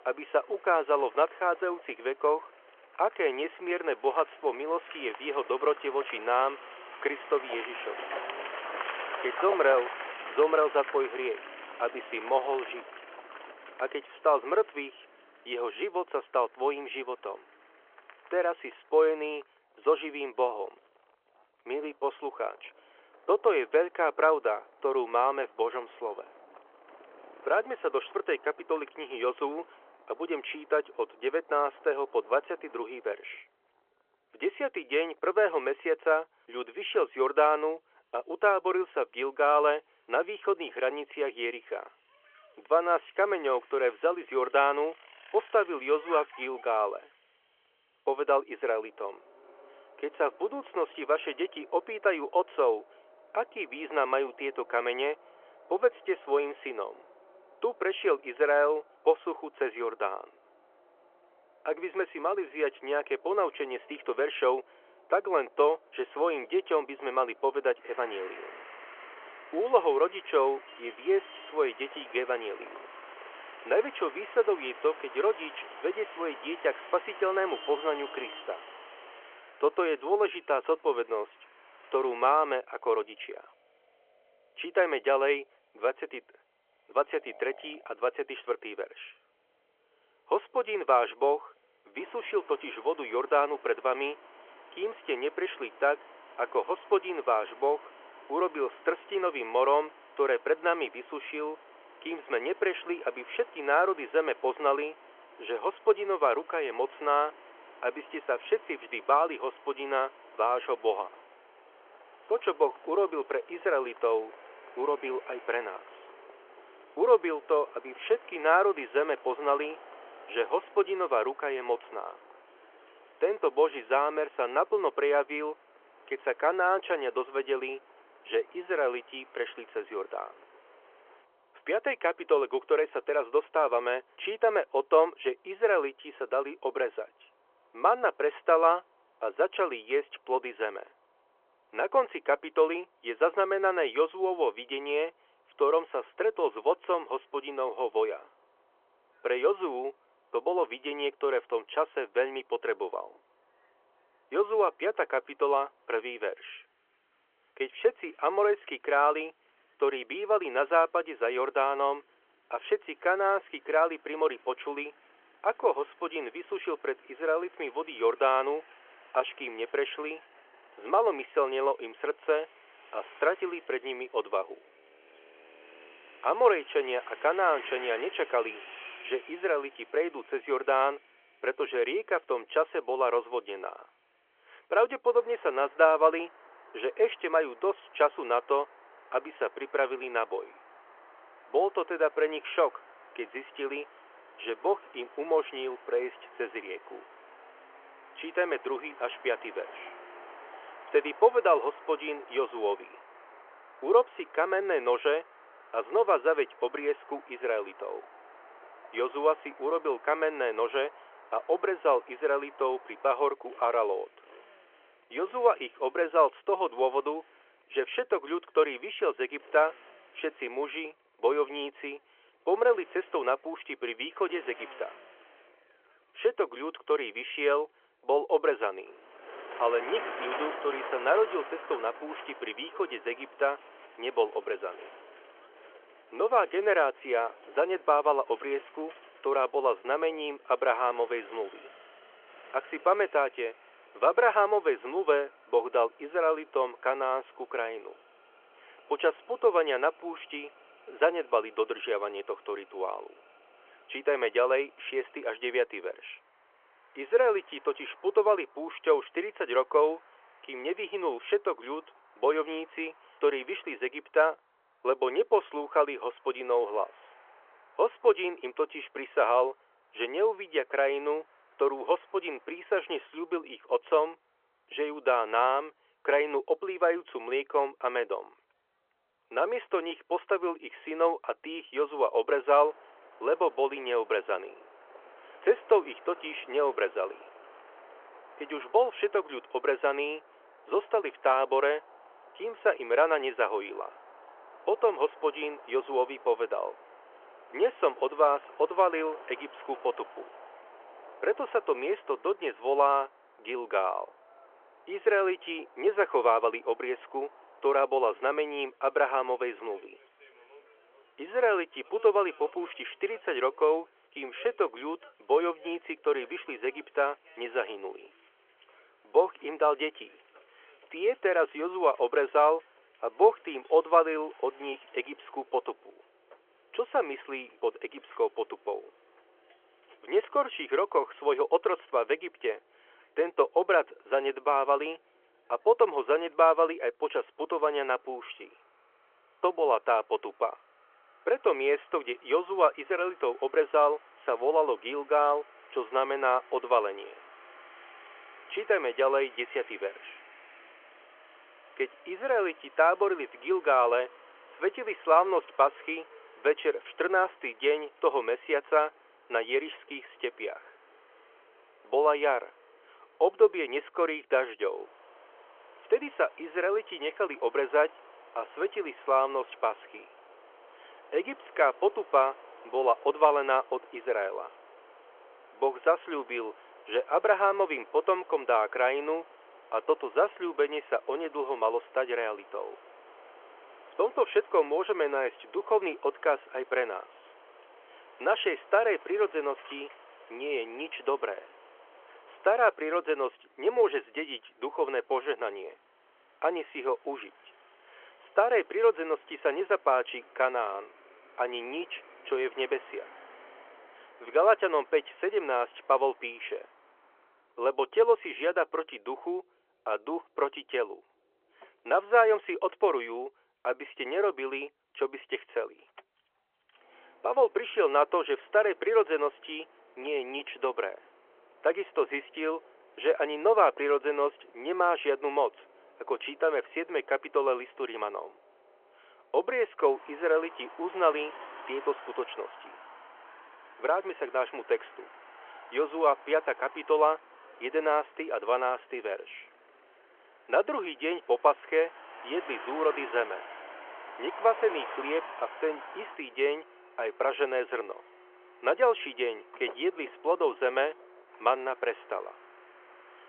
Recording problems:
phone-call audio
traffic noise; faint; throughout; 20 dB below the speech

